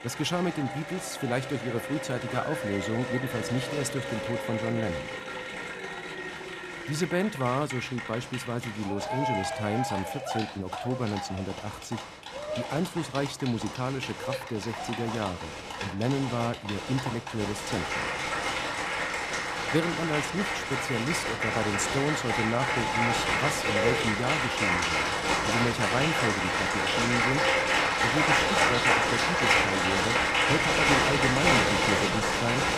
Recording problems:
crowd noise; very loud; throughout; 4 dB above the speech

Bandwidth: 14.5 kHz